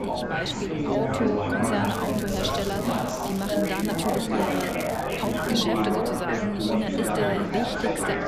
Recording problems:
chatter from many people; very loud; throughout; 3 dB above the speech
wind noise on the microphone; occasional gusts; 20 dB below the speech
crackling; noticeable; from 2 to 4.5 s and from 4.5 to 5.5 s; 10 dB below the speech
electrical hum; faint; throughout; 50 Hz, 25 dB below the speech

